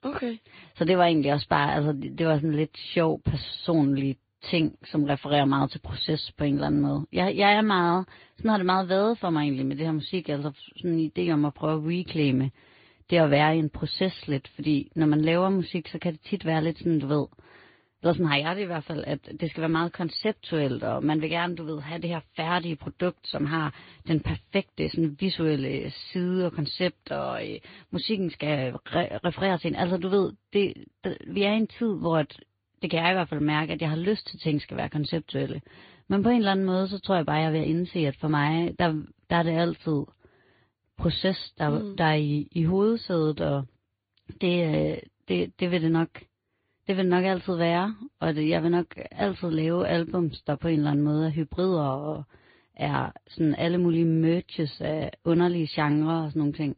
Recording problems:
high frequencies cut off; severe; nothing above 4.5 kHz
garbled, watery; slightly

